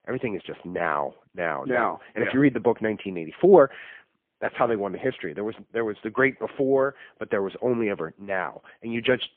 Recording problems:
phone-call audio; poor line; nothing above 3.5 kHz

